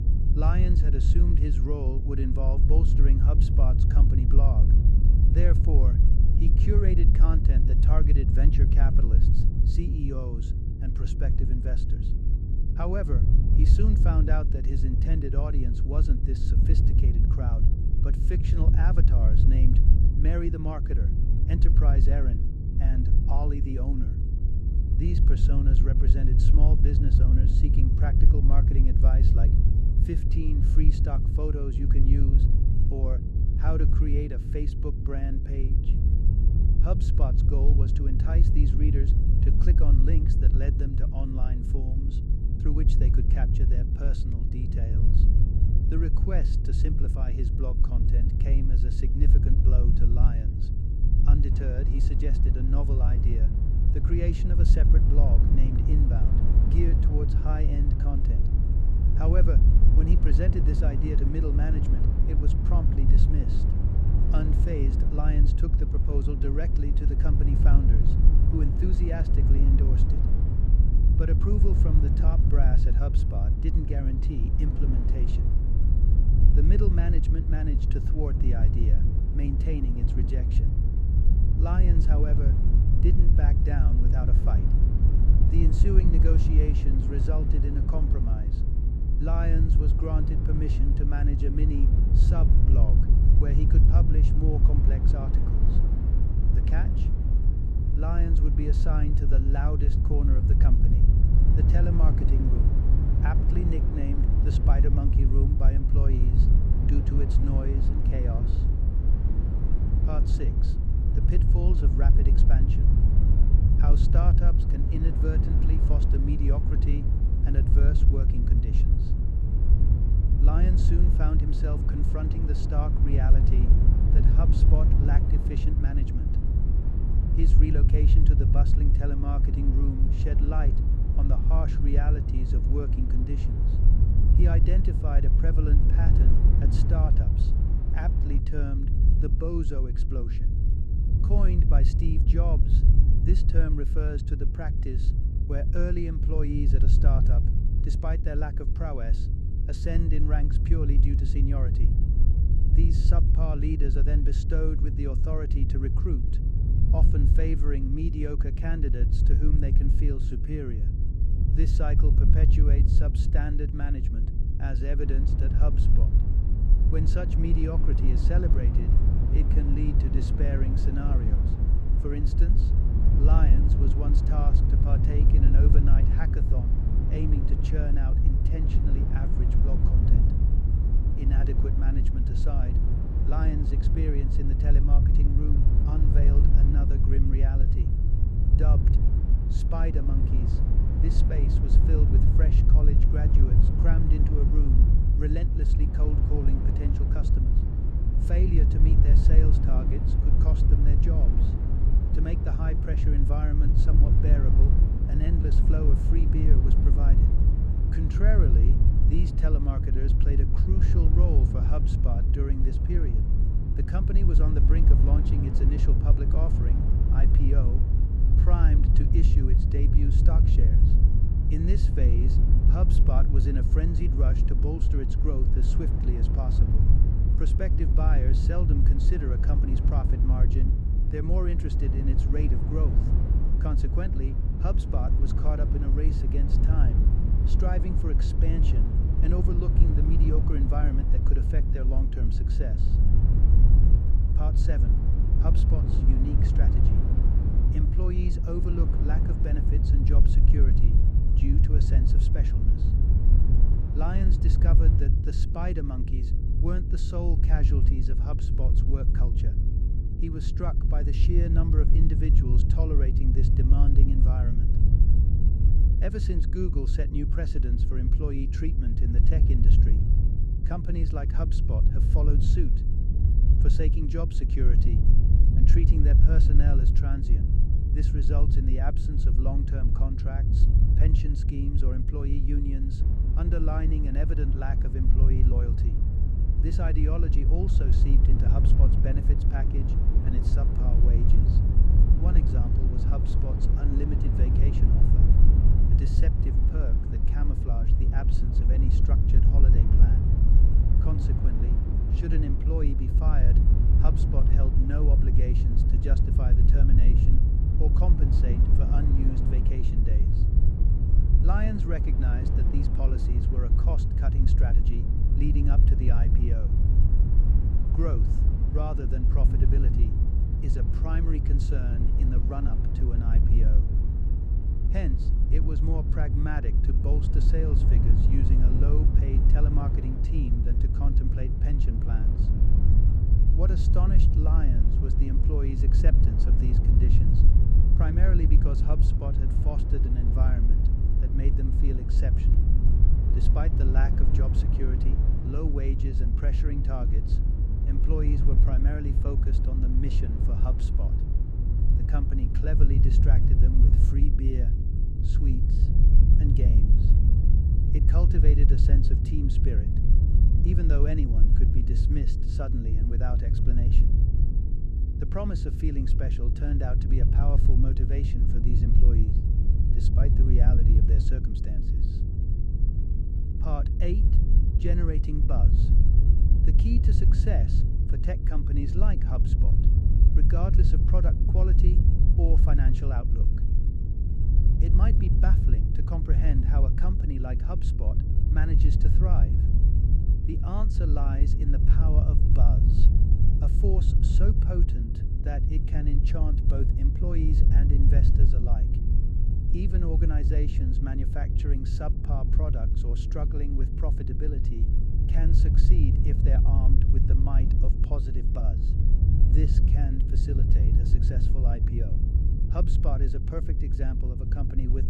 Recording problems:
wind noise on the microphone; heavy; 2 dB below the speech
low rumble; loud; from 52 s to 2:18, from 2:45 to 4:15 and from 4:43 to 5:54; 5 dB below the speech
electrical hum; noticeable; throughout; 50 Hz, 10 dB below the speech

